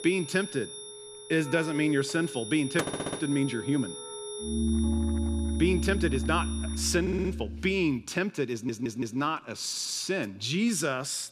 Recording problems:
background music; loud; until 7.5 s; 4 dB below the speech
high-pitched whine; noticeable; until 7 s; 10 kHz, 10 dB below the speech
household noises; noticeable; throughout; 15 dB below the speech
audio stuttering; 4 times, first at 3 s

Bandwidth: 14 kHz